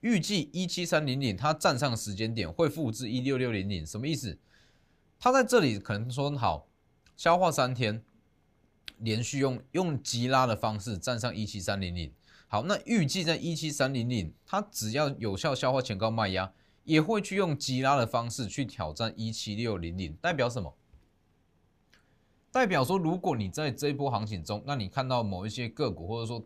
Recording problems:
none

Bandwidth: 15 kHz